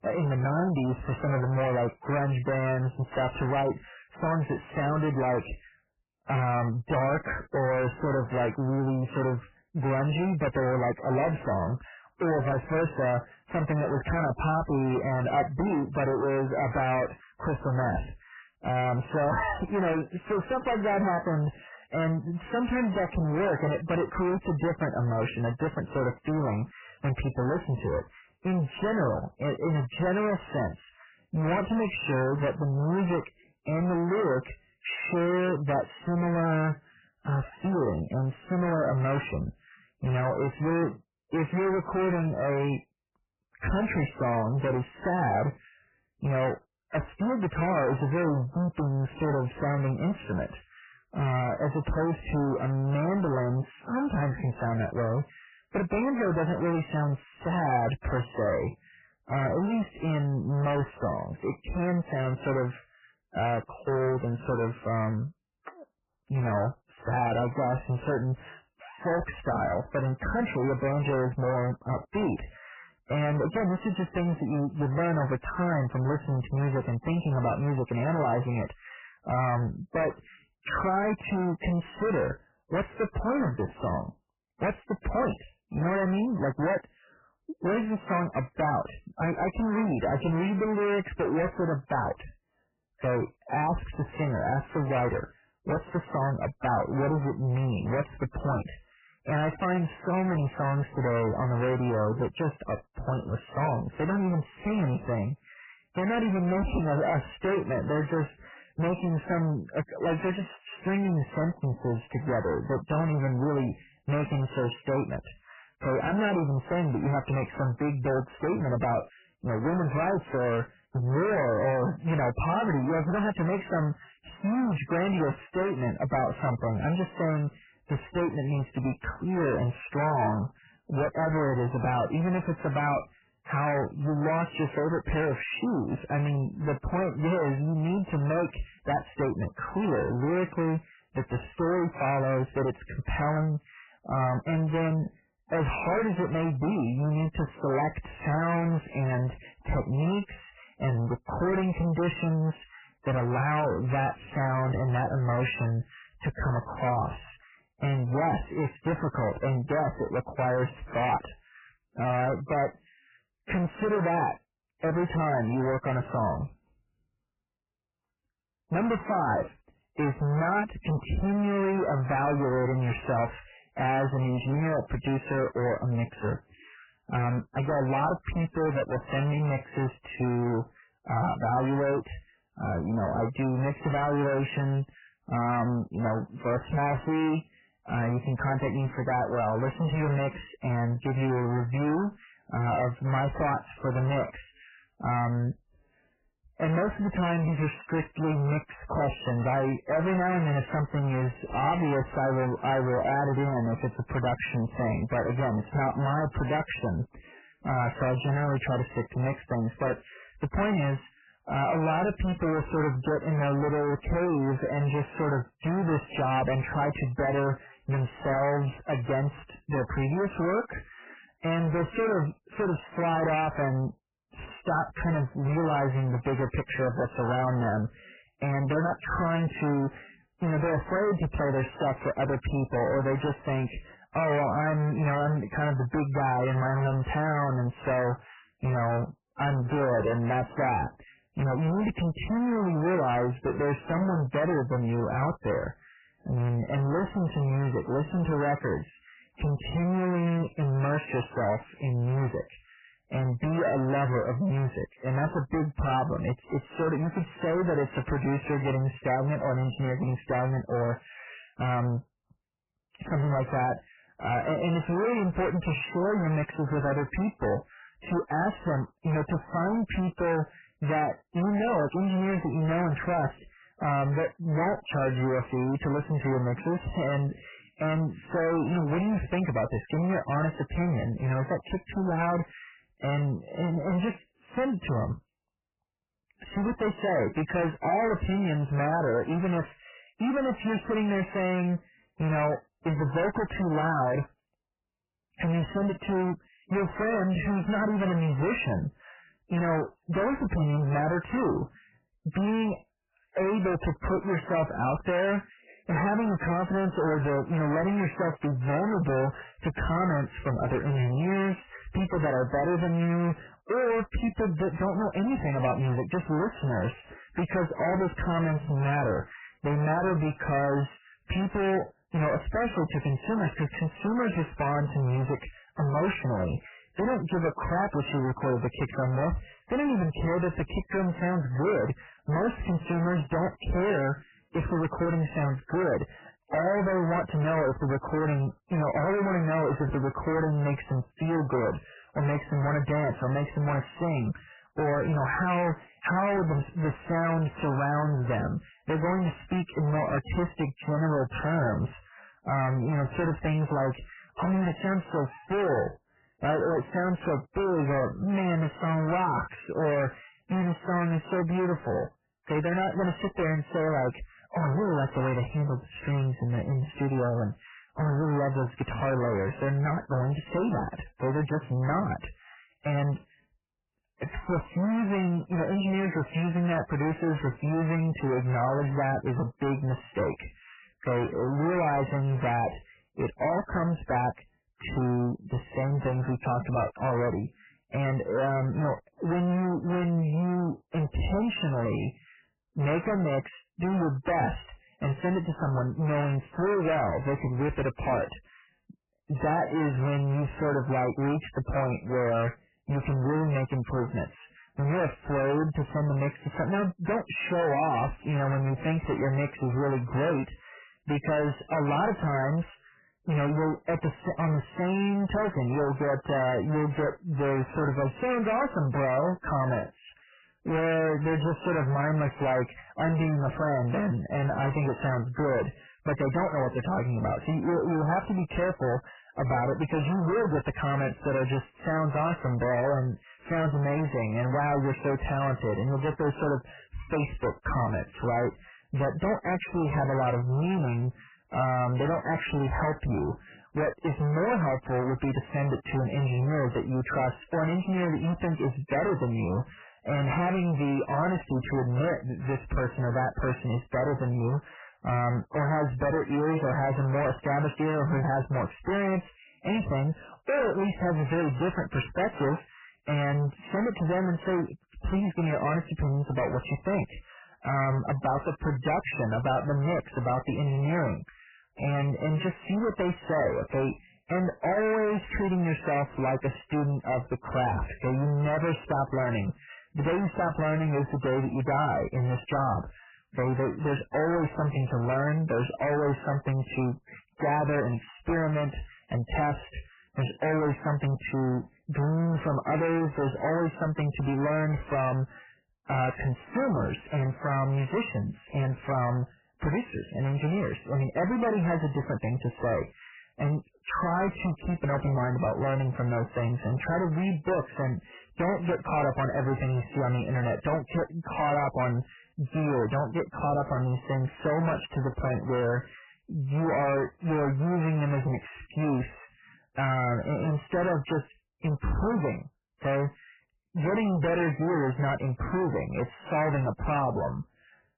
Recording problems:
distortion; heavy; 5 dB below the speech
garbled, watery; badly; nothing above 3 kHz

